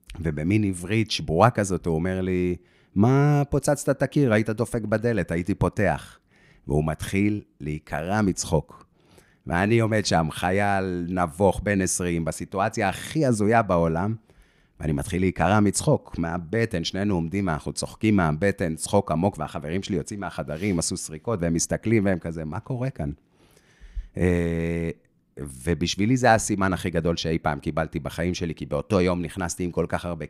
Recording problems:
none

